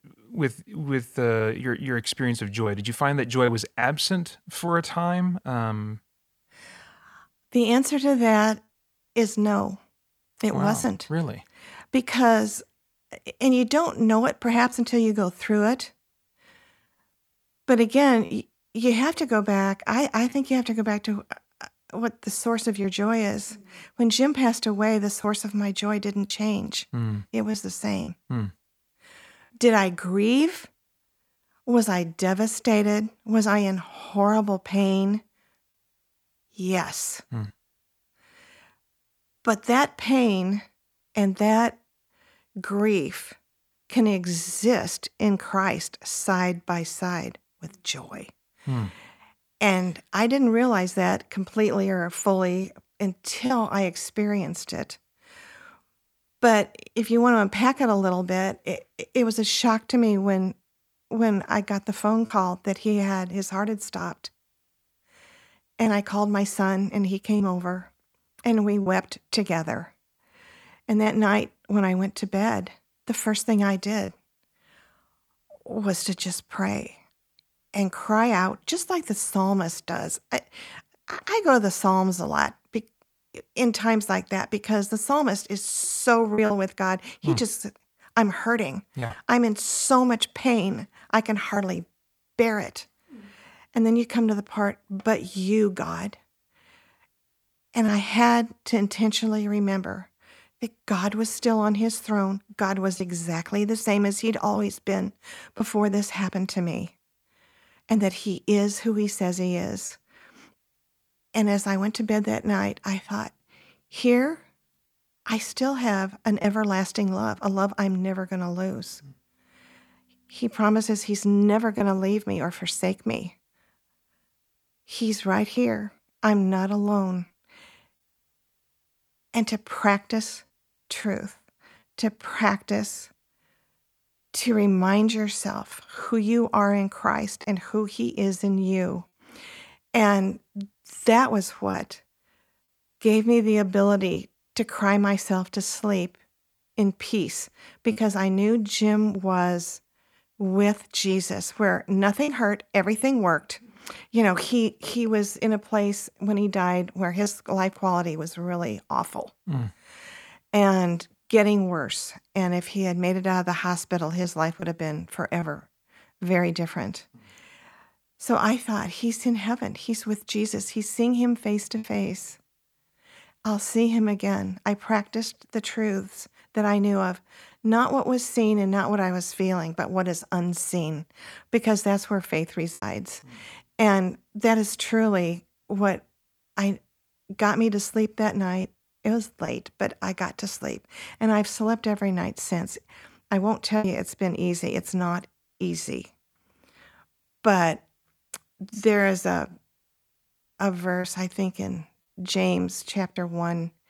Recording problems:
choppy; occasionally; 1% of the speech affected

